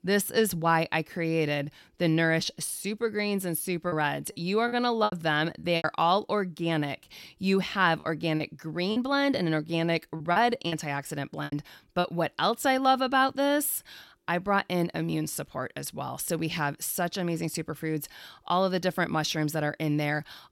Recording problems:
choppy; very; from 4 to 6 s and from 8 to 12 s; 11% of the speech affected

